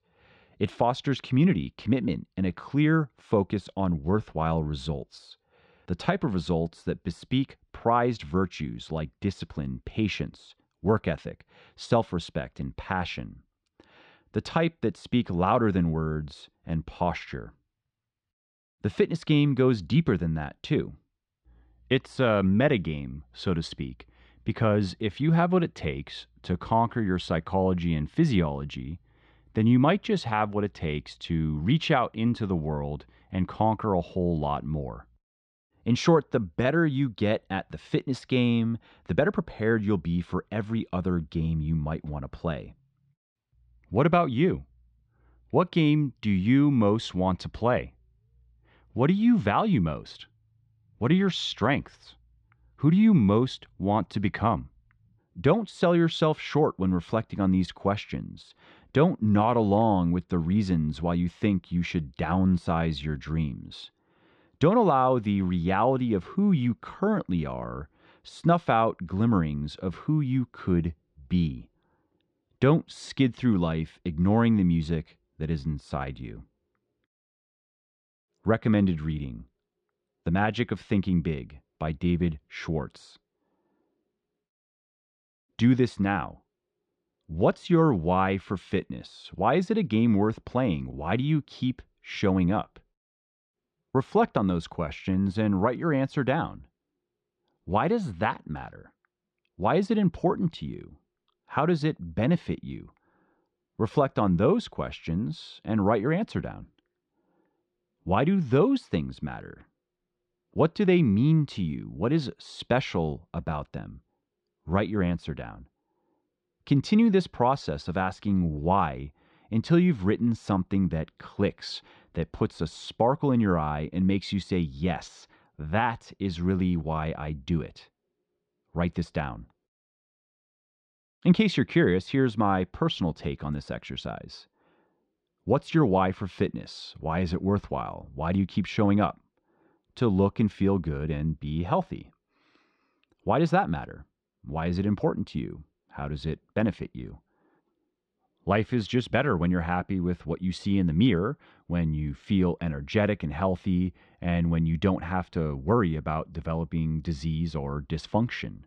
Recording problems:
muffled; slightly; fading above 4 kHz

